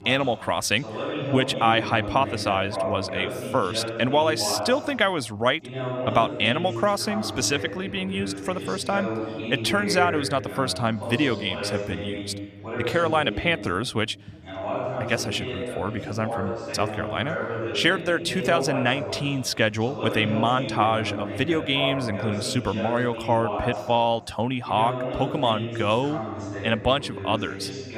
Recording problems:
background chatter; loud; throughout; 2 voices, 6 dB below the speech

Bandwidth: 14.5 kHz